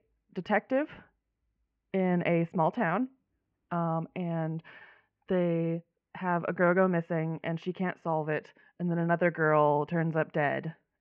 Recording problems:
muffled; very; fading above 2.5 kHz

